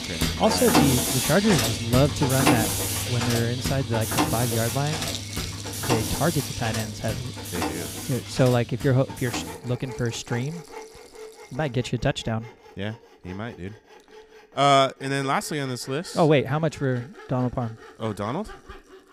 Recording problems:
machinery noise; loud; throughout; 1 dB below the speech
background music; noticeable; throughout; 15 dB below the speech

